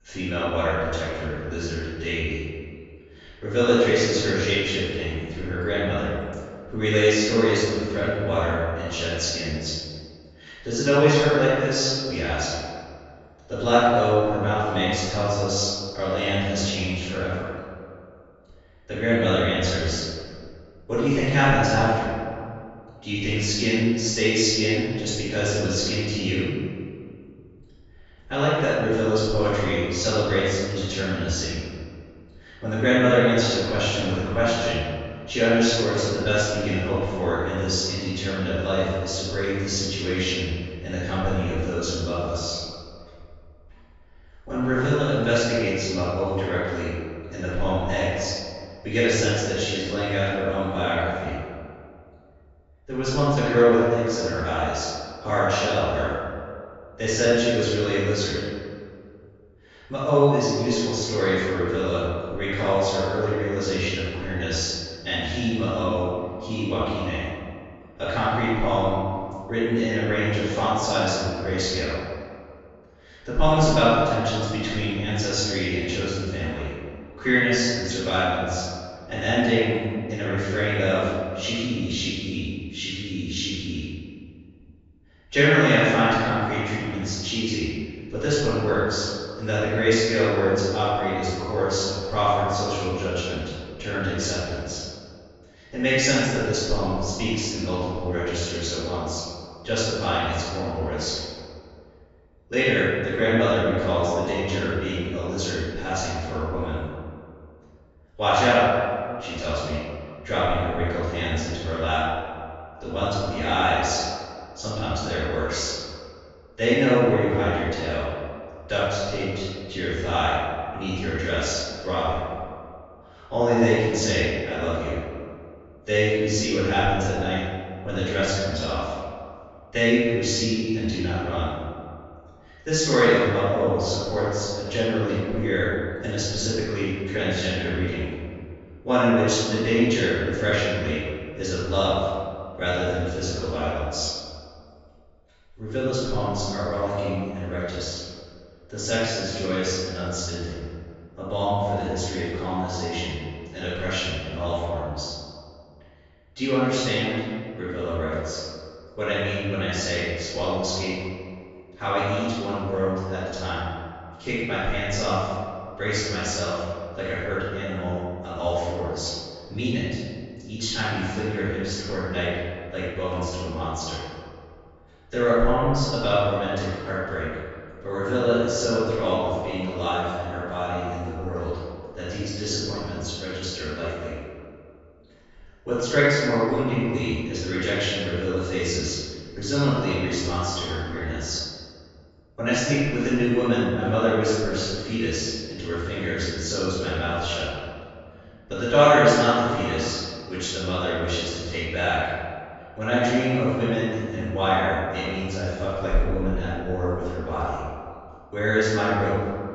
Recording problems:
room echo; strong; dies away in 1.9 s
off-mic speech; far
high frequencies cut off; noticeable; nothing above 8 kHz

